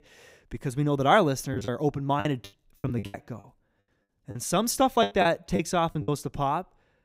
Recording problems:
choppy; very; from 1.5 to 6 s; 21% of the speech affected

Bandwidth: 15.5 kHz